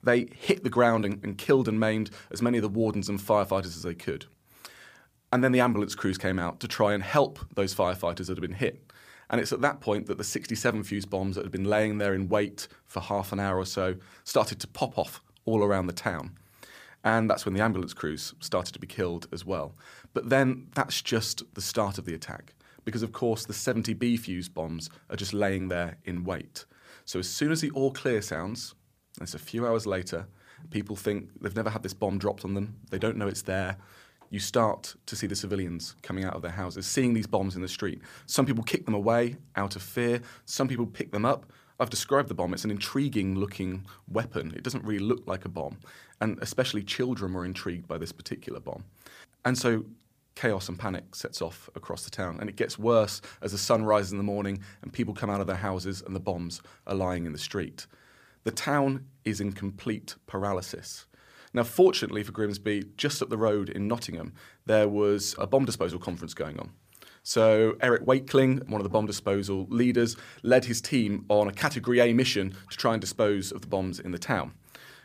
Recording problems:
none

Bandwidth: 15 kHz